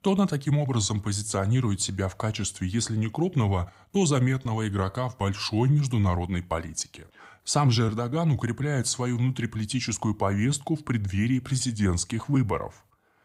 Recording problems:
none

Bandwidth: 15.5 kHz